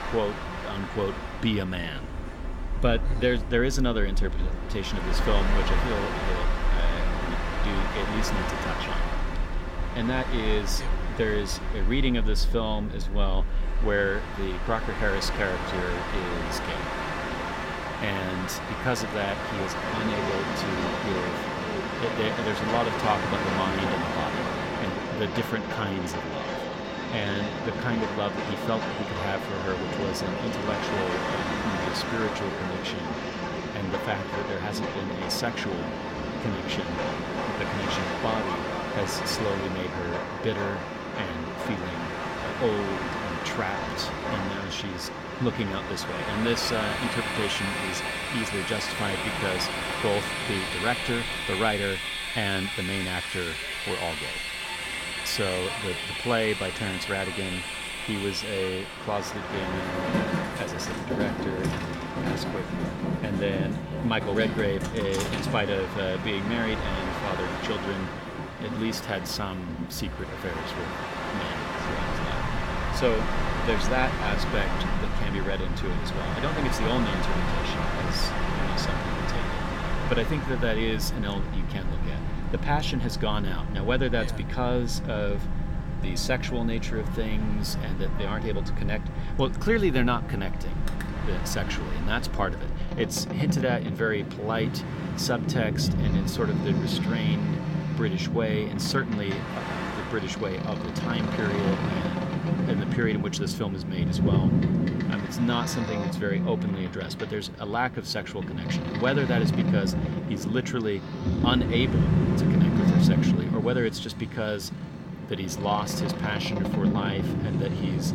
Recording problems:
train or aircraft noise; very loud; throughout; 1 dB above the speech

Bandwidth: 16.5 kHz